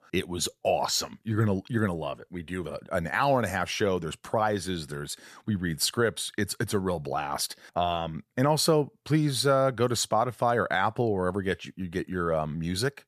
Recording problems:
none

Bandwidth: 14.5 kHz